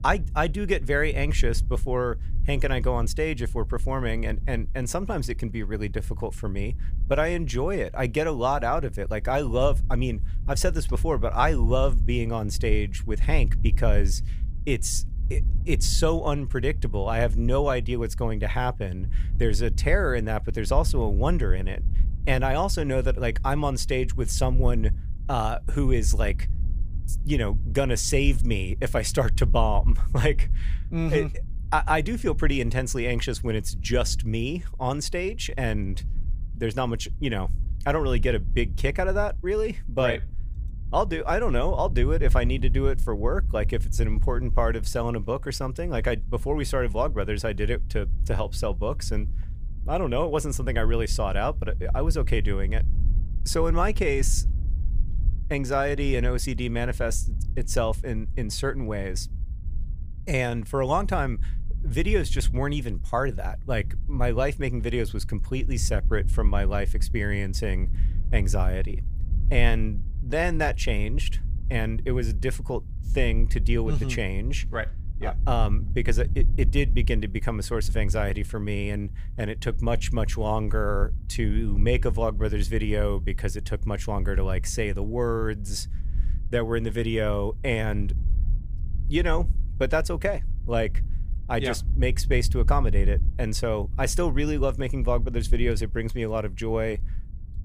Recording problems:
wind noise on the microphone; occasional gusts; 20 dB below the speech

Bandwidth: 15 kHz